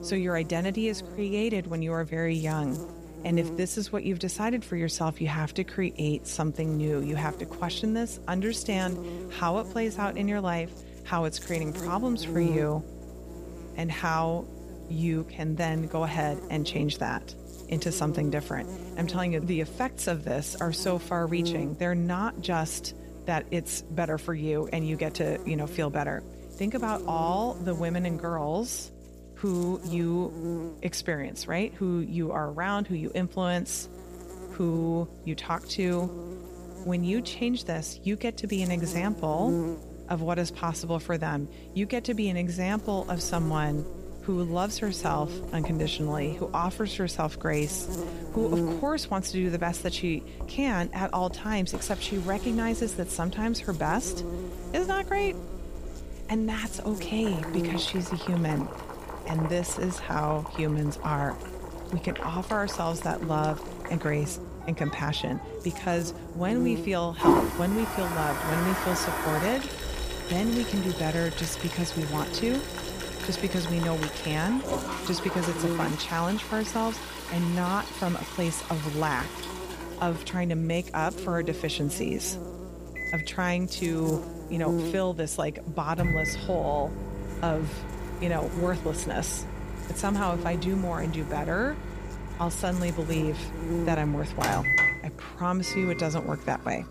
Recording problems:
household noises; loud; from 43 s on; 5 dB below the speech
electrical hum; noticeable; throughout; 60 Hz, 10 dB below the speech

